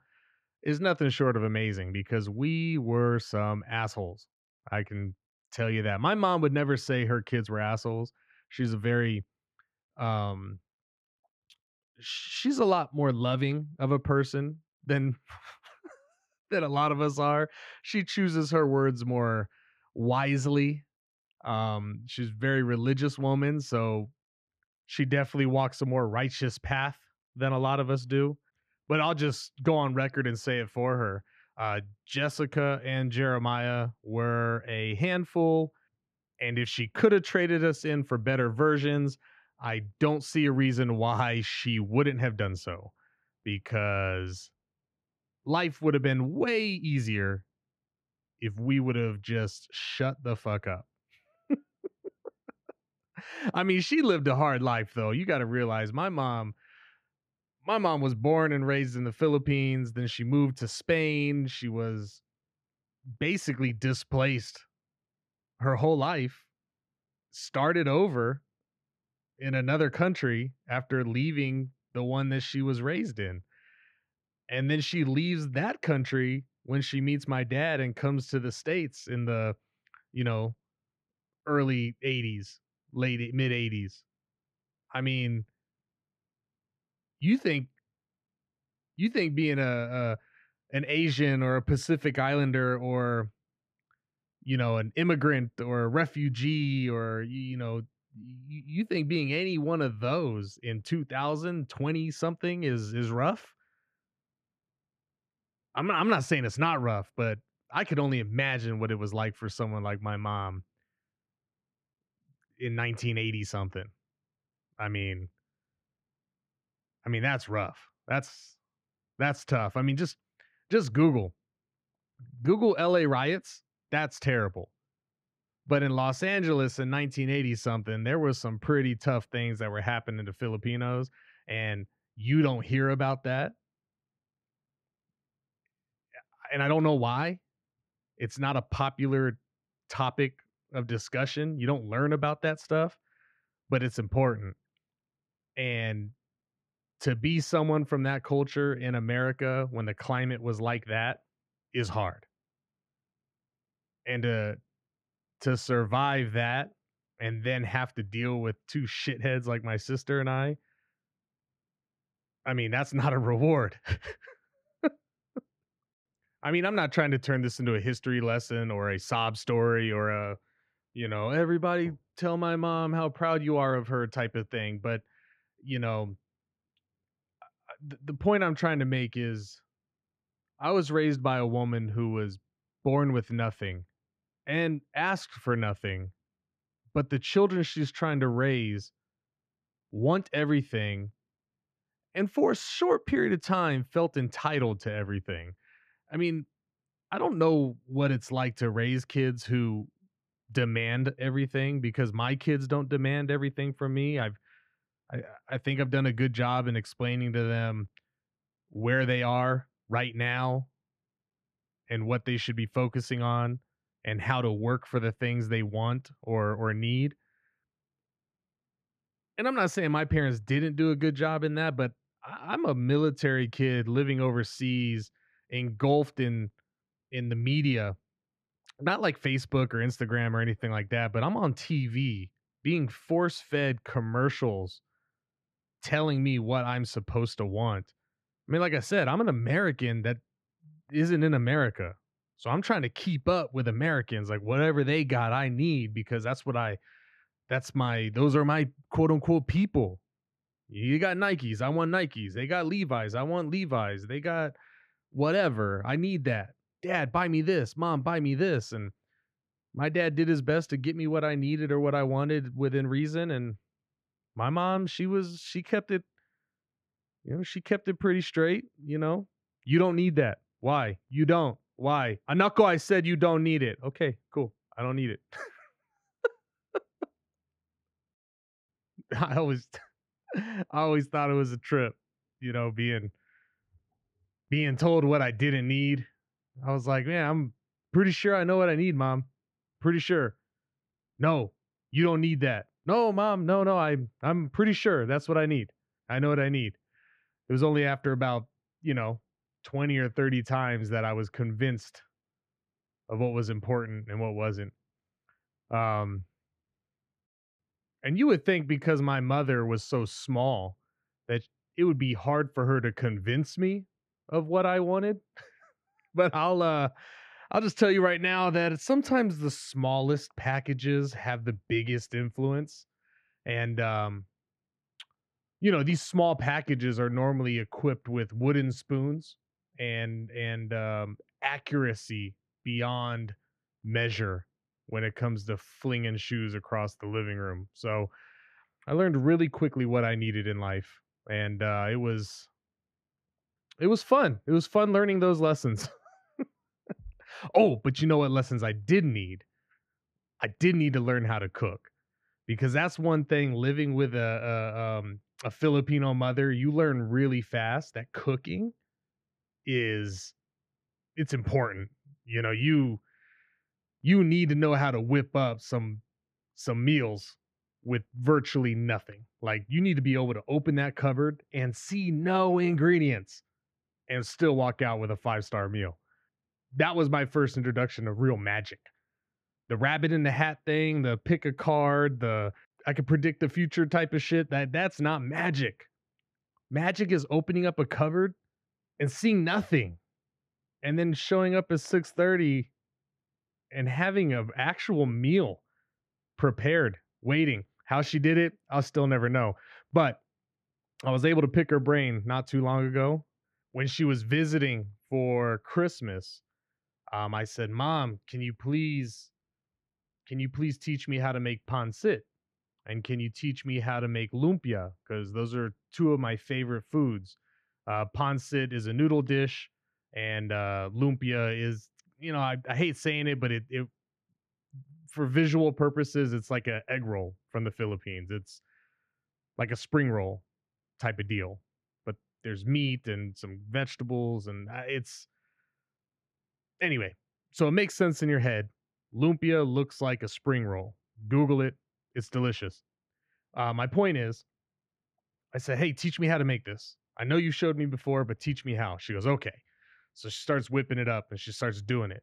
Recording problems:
muffled; slightly; fading above 3.5 kHz

